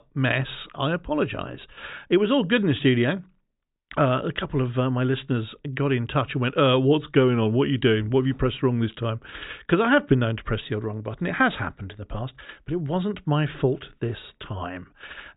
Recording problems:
high frequencies cut off; severe; nothing above 4 kHz

